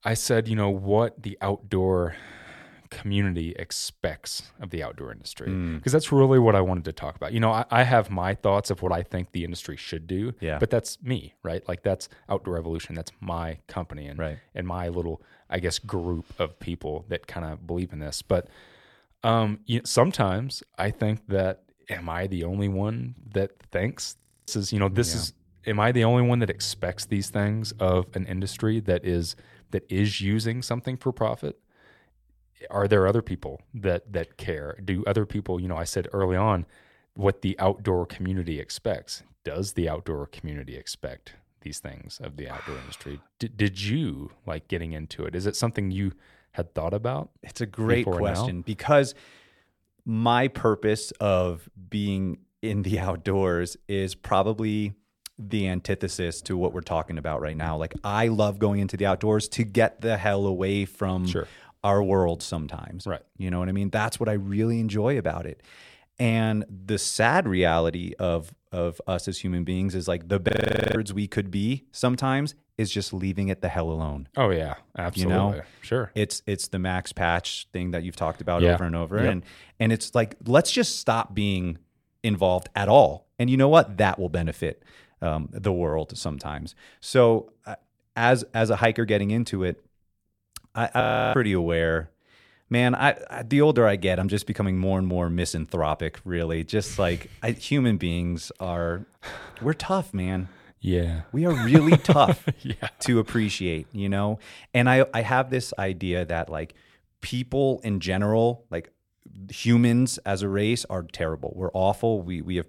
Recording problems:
audio freezing; at 24 s, at 1:10 and at 1:31

